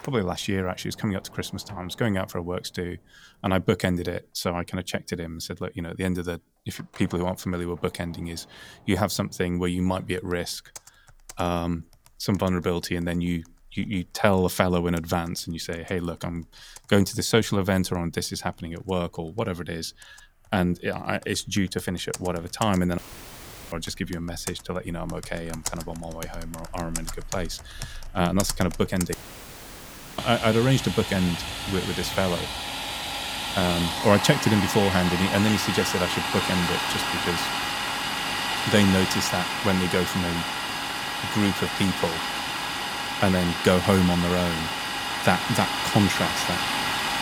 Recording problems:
household noises; loud; throughout; 2 dB below the speech
audio cutting out; filled with static; at 23 s for 0.5 s and at 29 s for 1 s

